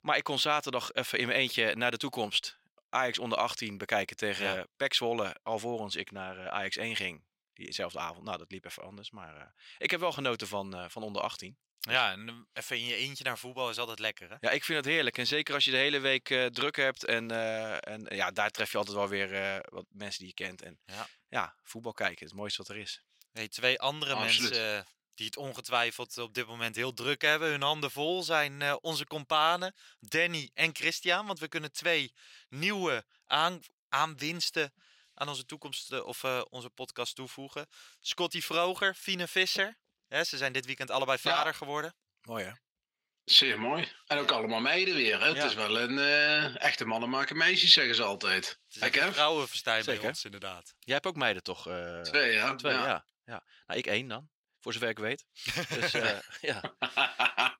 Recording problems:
thin; somewhat; fading below 1 kHz

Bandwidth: 16 kHz